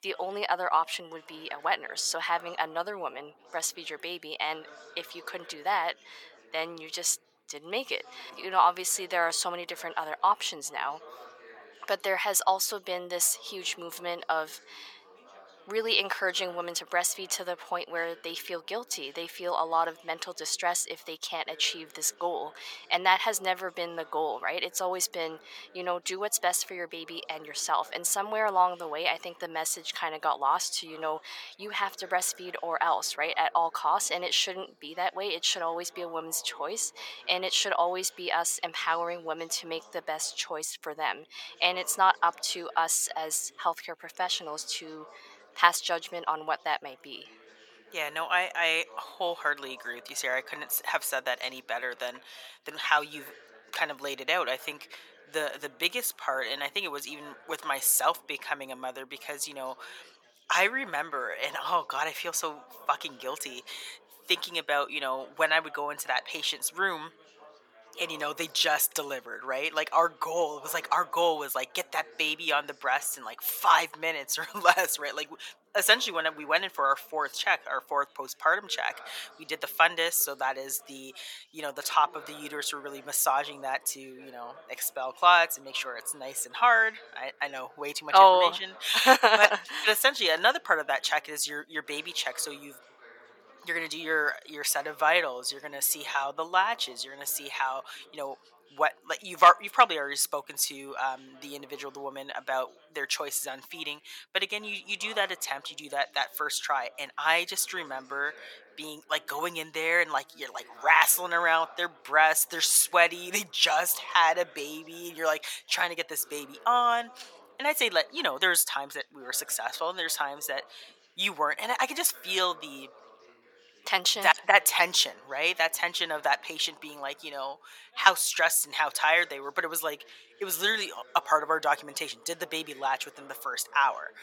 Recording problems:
thin; very; fading below 950 Hz
background chatter; faint; throughout; 4 voices, 25 dB below the speech

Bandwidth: 17 kHz